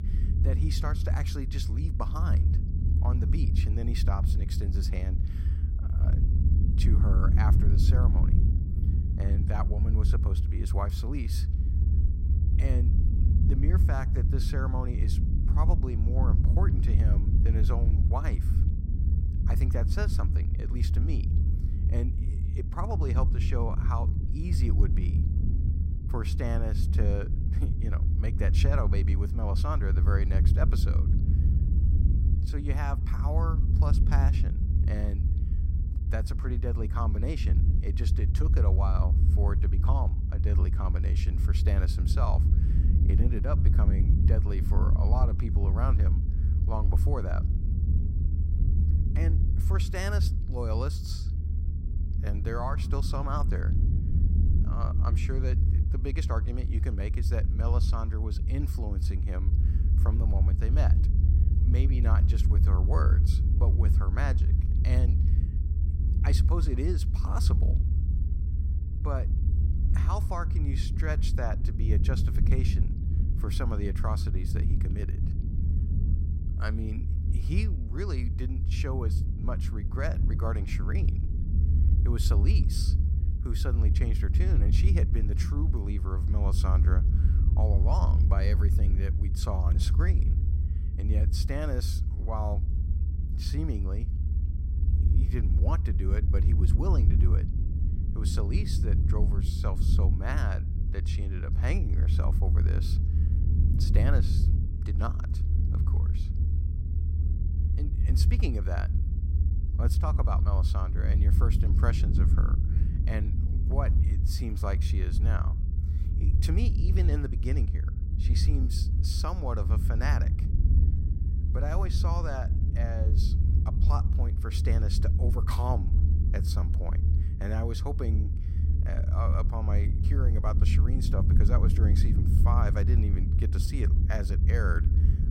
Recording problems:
low rumble; loud; throughout; 4 dB below the speech

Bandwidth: 16 kHz